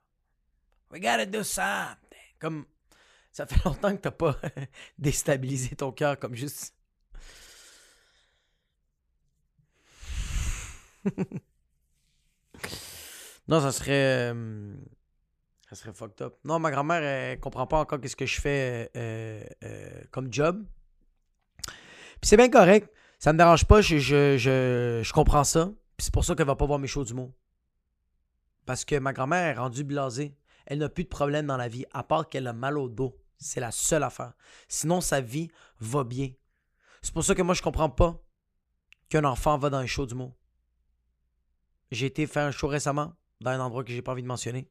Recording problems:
none

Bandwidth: 14.5 kHz